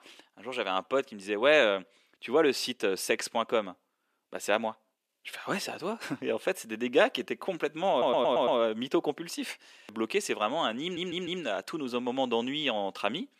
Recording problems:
thin; somewhat; fading below 350 Hz
audio stuttering; at 8 s and at 11 s

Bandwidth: 14.5 kHz